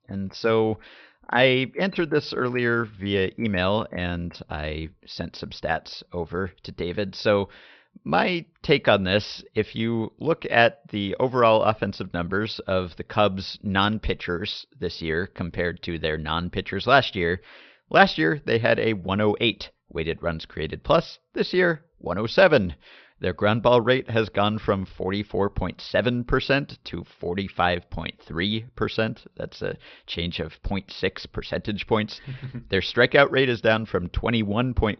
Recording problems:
high frequencies cut off; noticeable; nothing above 5.5 kHz

